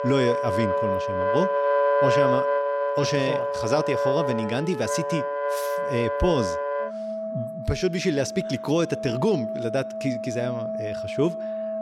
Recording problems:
background music; very loud; throughout; as loud as the speech

